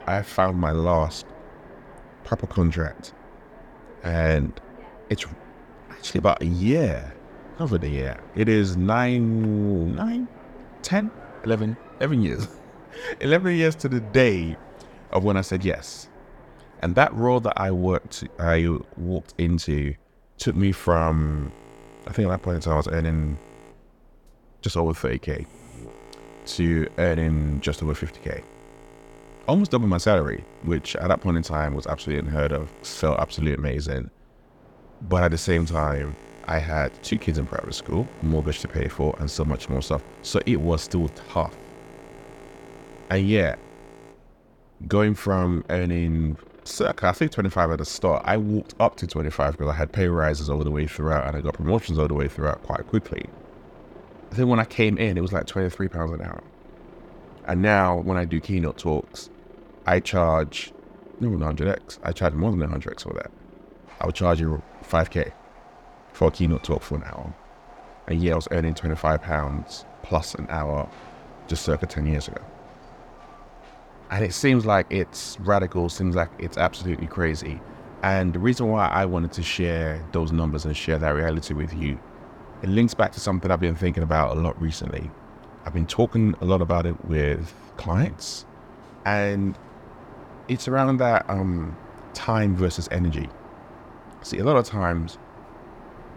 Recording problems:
train or aircraft noise; faint; throughout; 20 dB below the speech

